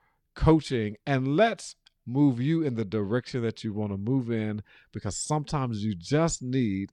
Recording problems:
none

